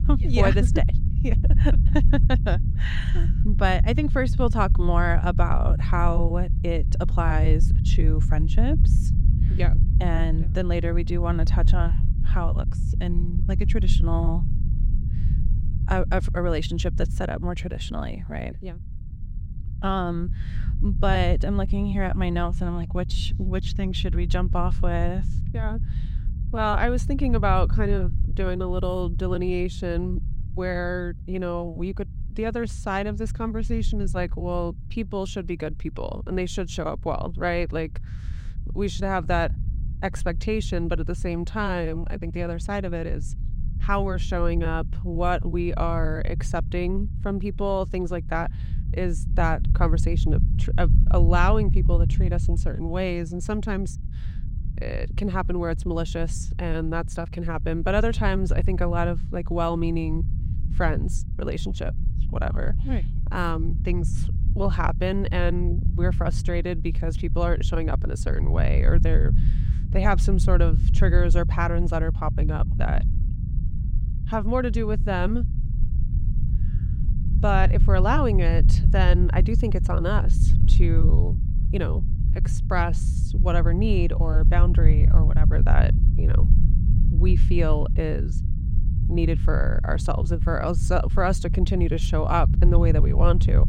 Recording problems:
low rumble; noticeable; throughout; 10 dB below the speech

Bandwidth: 16 kHz